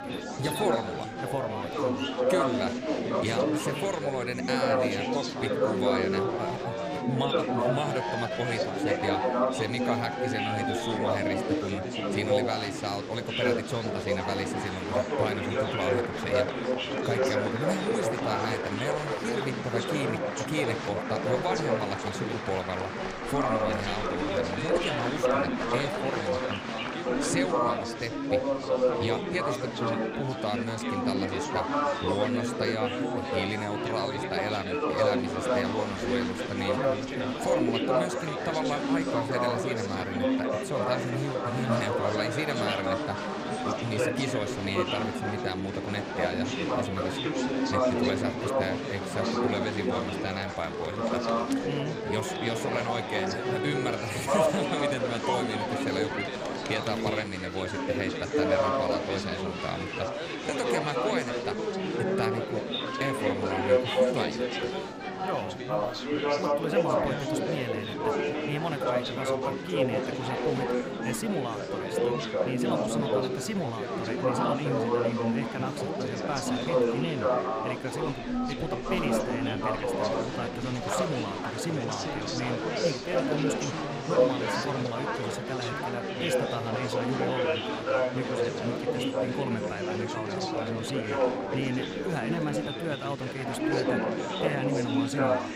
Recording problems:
chatter from many people; very loud; throughout; 5 dB above the speech

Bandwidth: 15.5 kHz